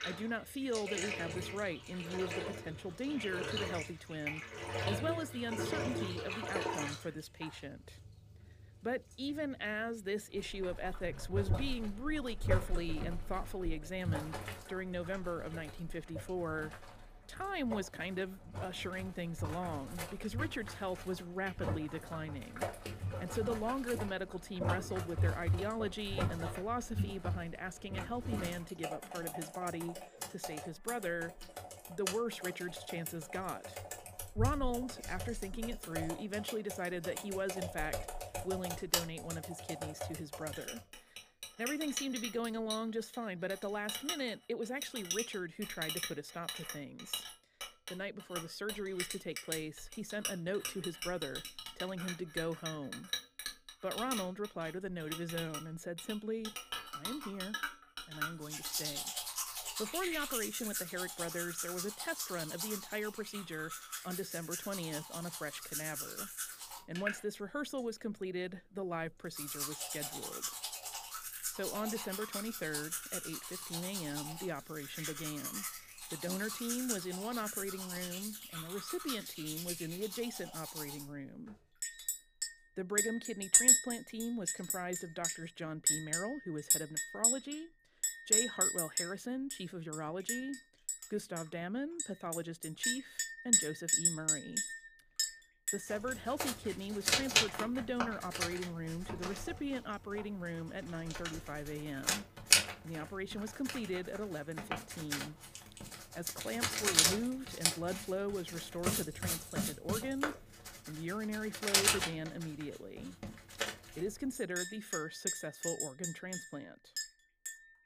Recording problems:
household noises; very loud; throughout; 4 dB above the speech

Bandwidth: 15 kHz